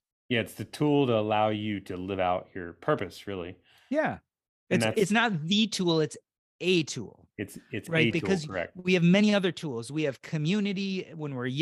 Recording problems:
abrupt cut into speech; at the end

